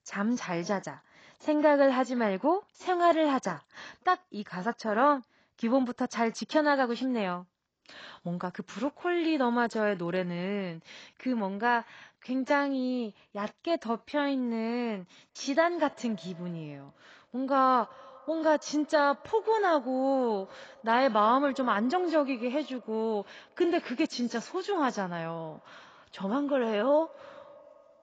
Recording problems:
garbled, watery; badly; nothing above 7.5 kHz
echo of what is said; faint; from 15 s on; 90 ms later, 25 dB below the speech

